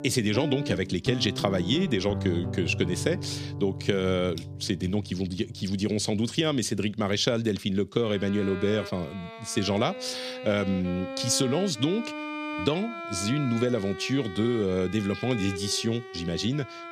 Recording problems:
background music; loud; throughout; 9 dB below the speech

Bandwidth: 14.5 kHz